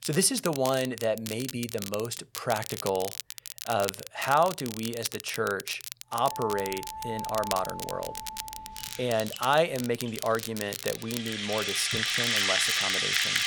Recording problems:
background music; very loud; from 6.5 s on; 2 dB above the speech
crackle, like an old record; loud; 8 dB below the speech

